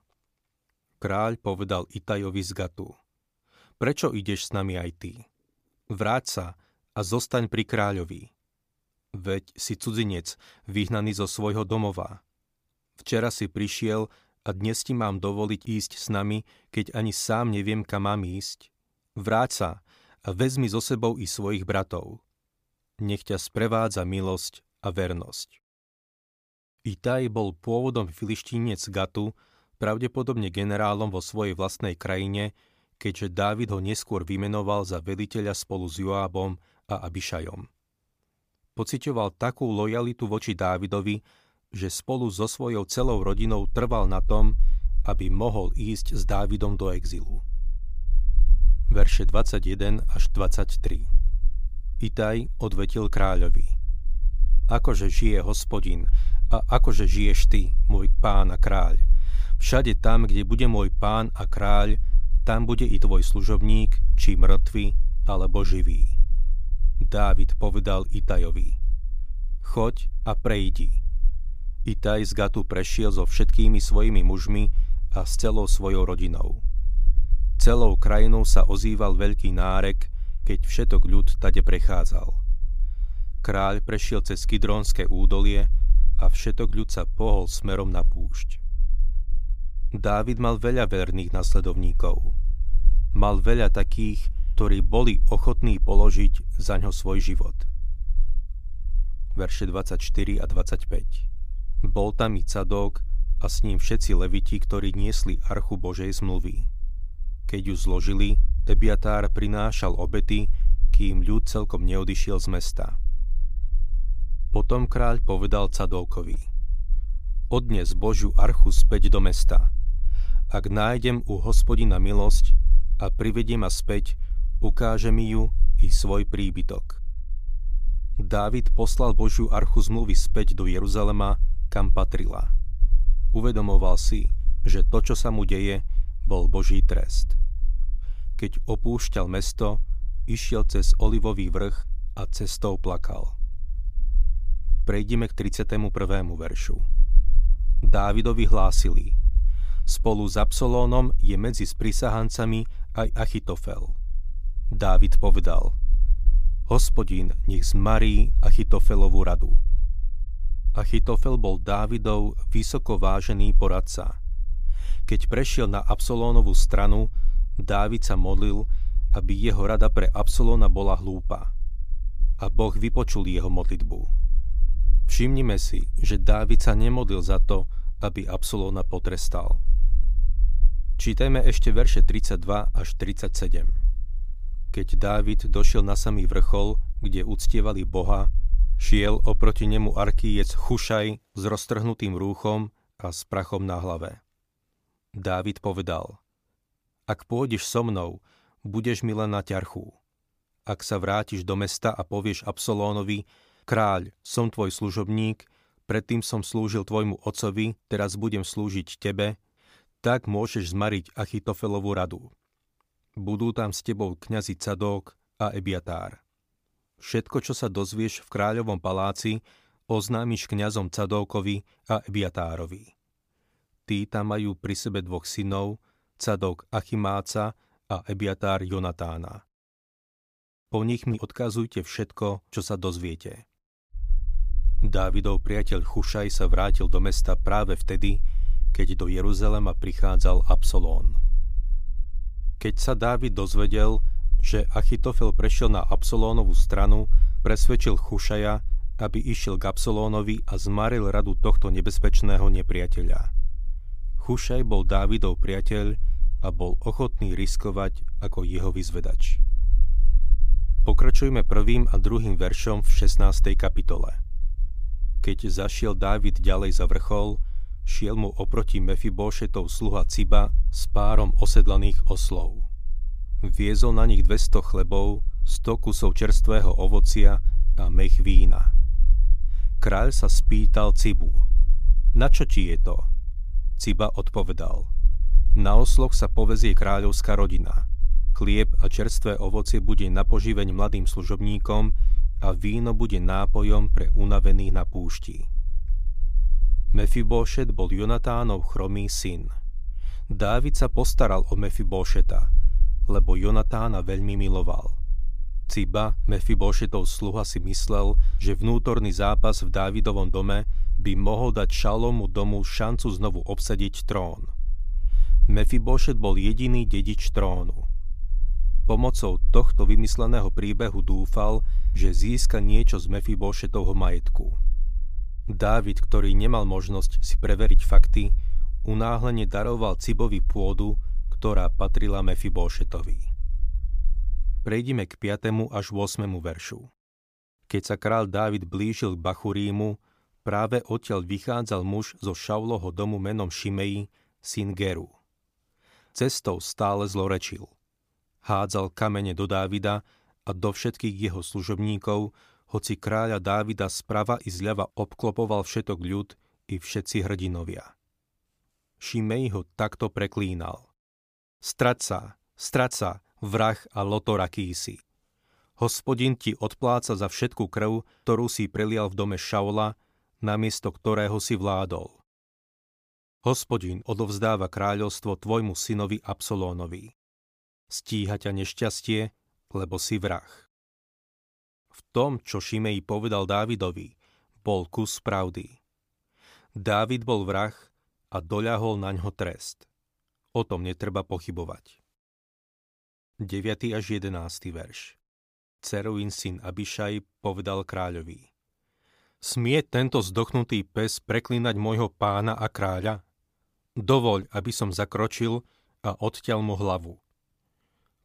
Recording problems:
low rumble; faint; from 43 s to 3:11 and from 3:54 to 5:35; 25 dB below the speech

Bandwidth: 15 kHz